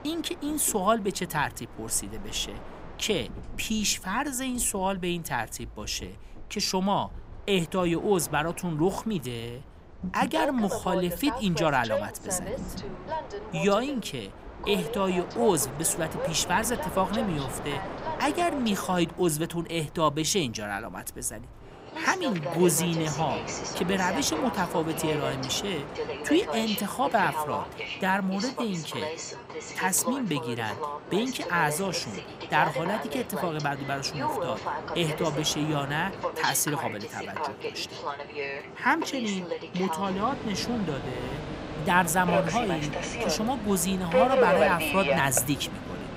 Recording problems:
train or aircraft noise; loud; throughout; 5 dB below the speech

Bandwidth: 15.5 kHz